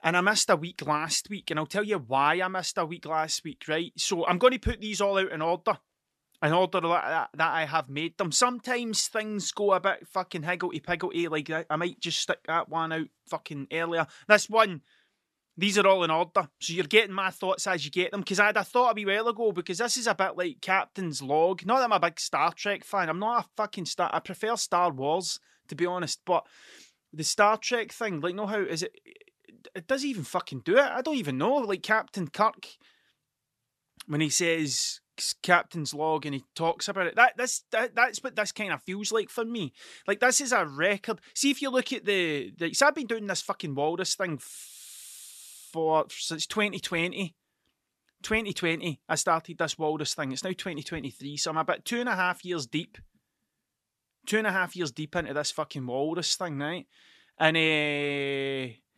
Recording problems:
none

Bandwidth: 13.5 kHz